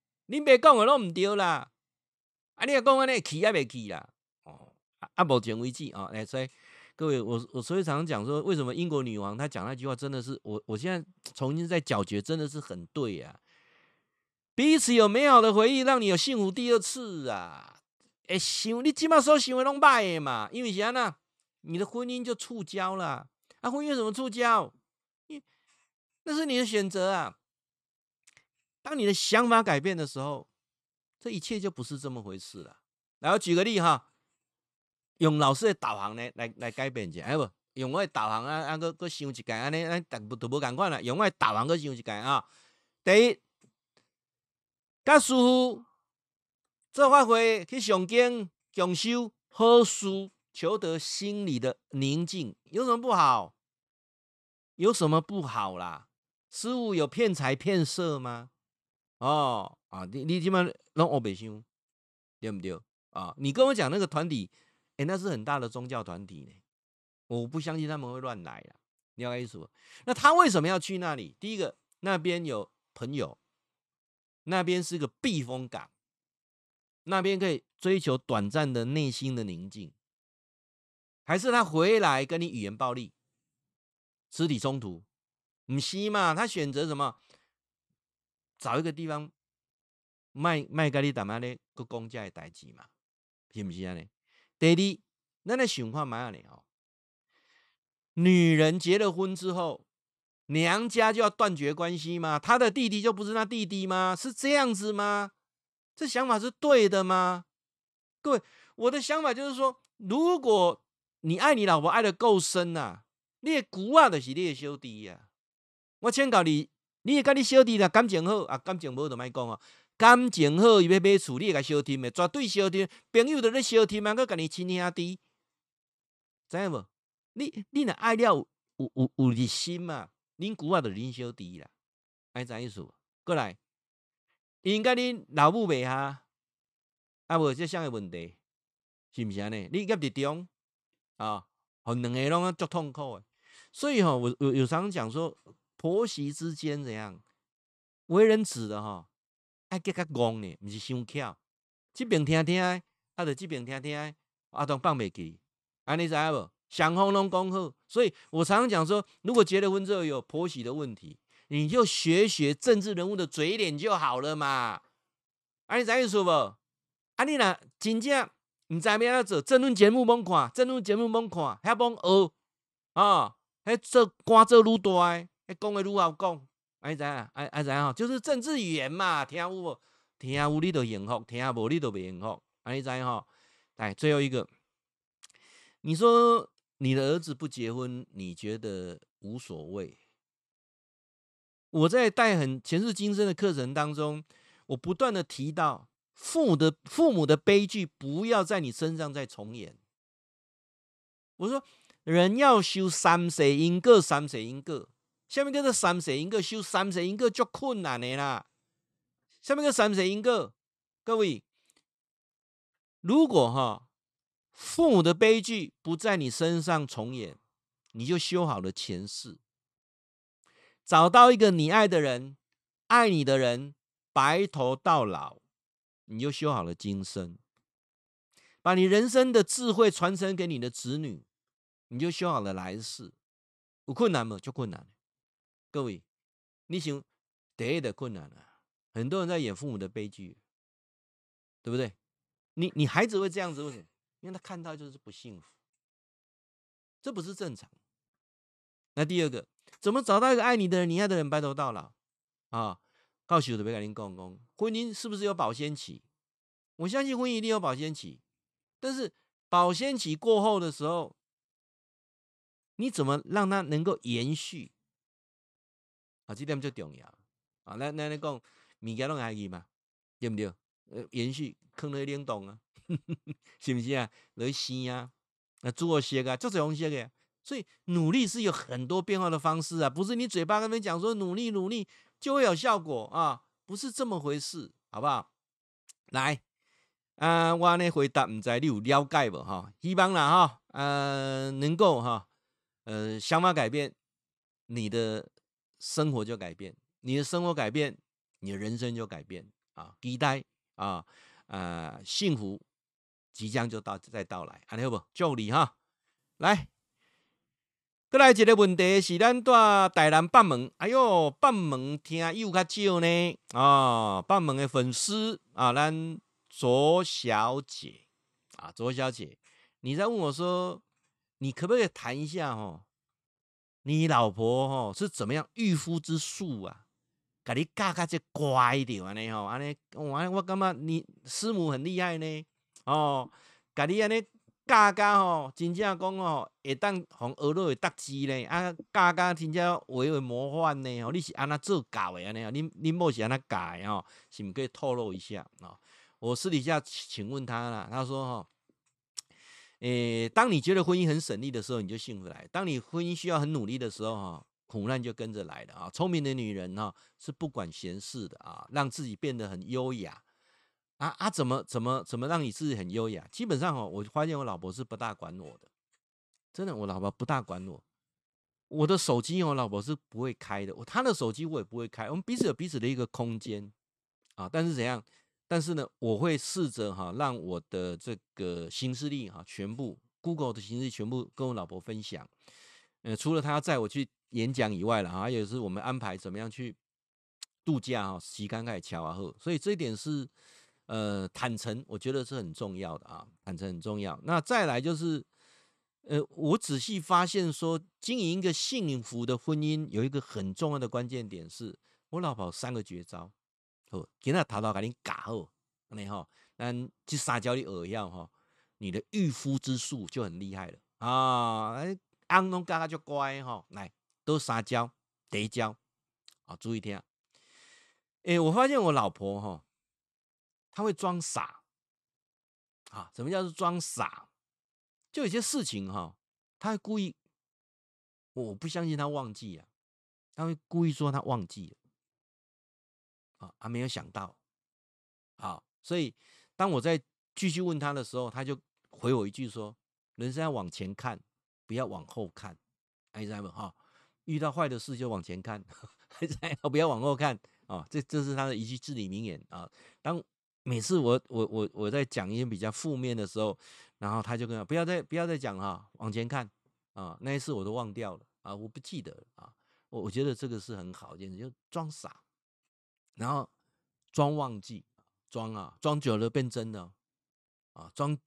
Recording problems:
none

